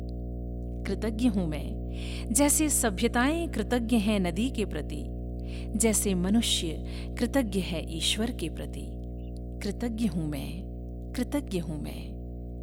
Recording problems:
electrical hum; noticeable; throughout; 60 Hz, 15 dB below the speech

